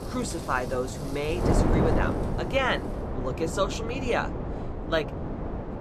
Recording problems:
wind noise on the microphone; heavy; 5 dB below the speech
rain or running water; noticeable; throughout; 20 dB below the speech

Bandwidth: 14.5 kHz